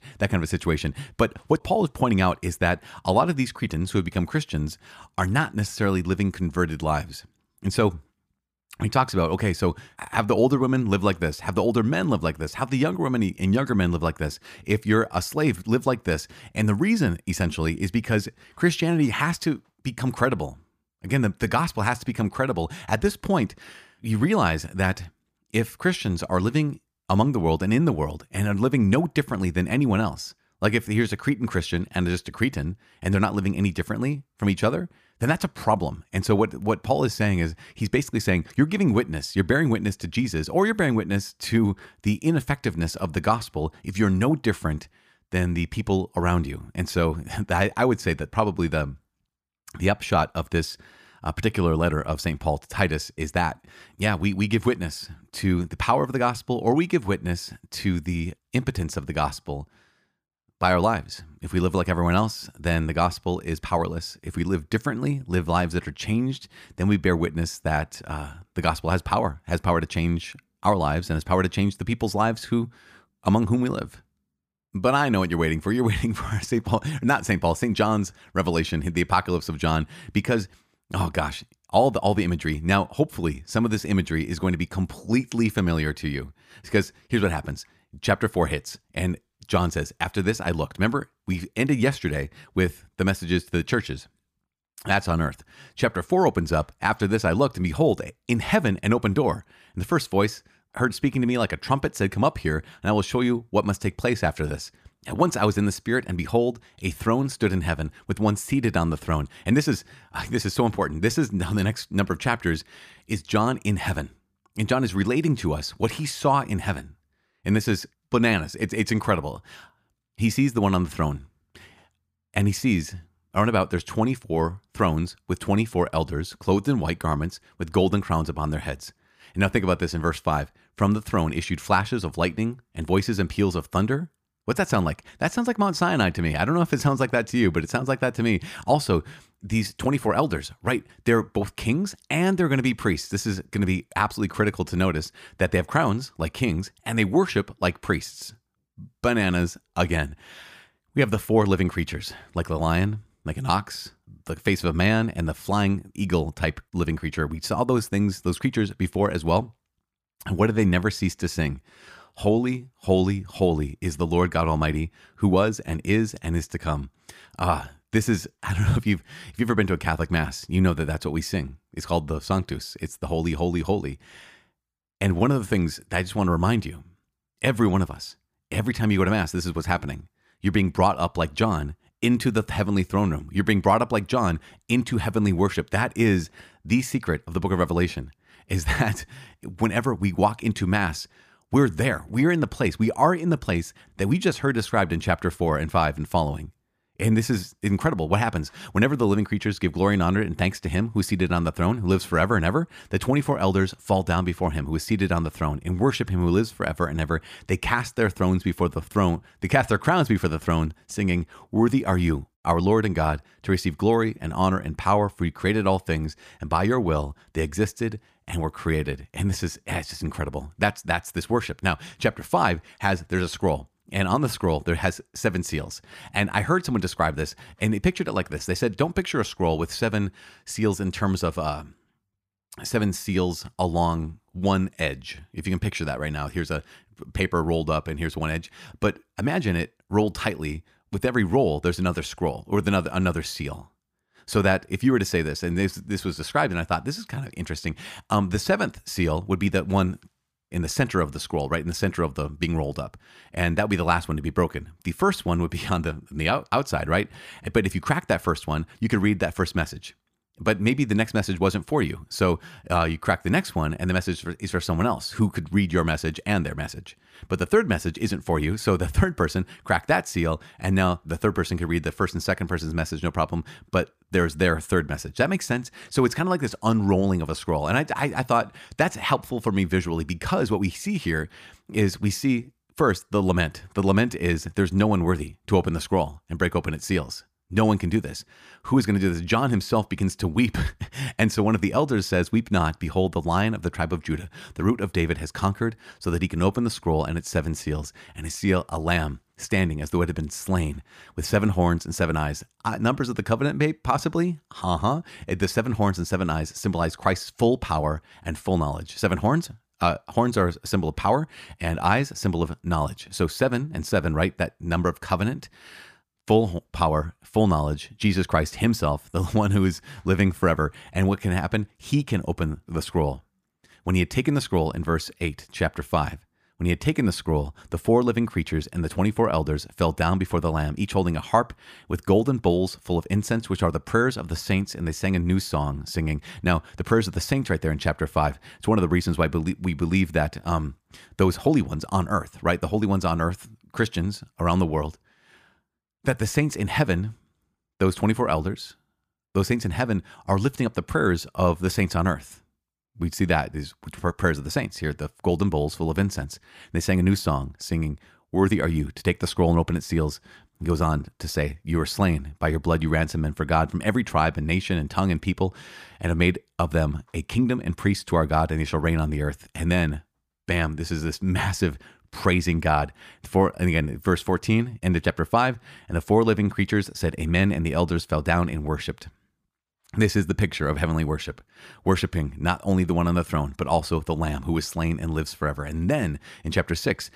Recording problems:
none

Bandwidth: 15 kHz